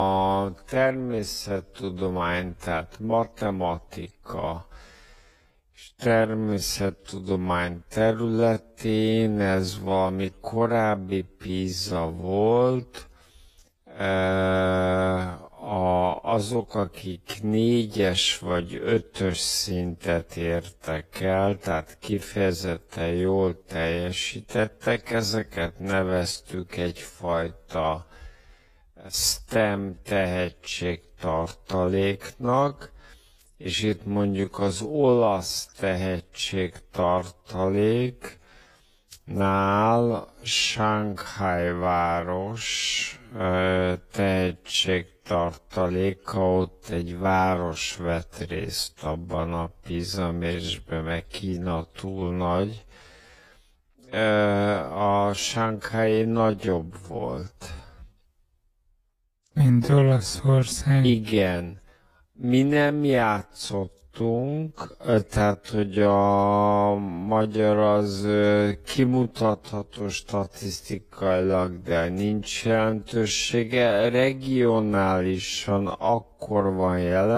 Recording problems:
wrong speed, natural pitch; too slow; 0.5 times normal speed
garbled, watery; slightly; nothing above 13 kHz
abrupt cut into speech; at the start and the end

